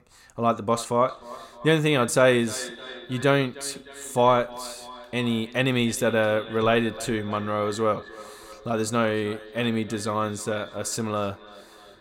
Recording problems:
echo of what is said; noticeable; throughout; 310 ms later, 15 dB below the speech

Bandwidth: 16.5 kHz